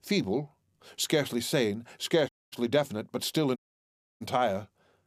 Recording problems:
audio cutting out; at 2.5 s and at 3.5 s for 0.5 s

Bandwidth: 14.5 kHz